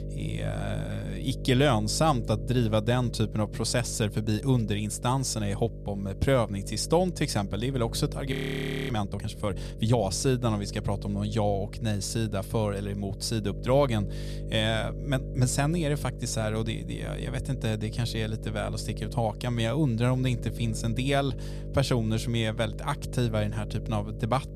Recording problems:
electrical hum; noticeable; throughout; 50 Hz, 15 dB below the speech
audio freezing; at 8.5 s for 0.5 s

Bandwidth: 14.5 kHz